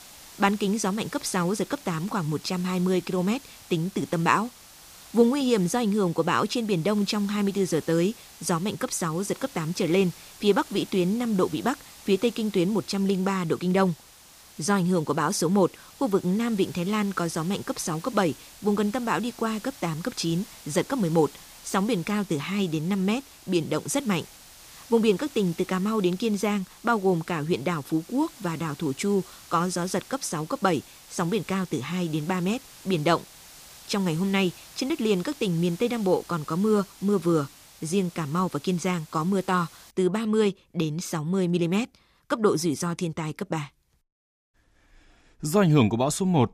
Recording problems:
hiss; noticeable; until 40 s; 20 dB below the speech

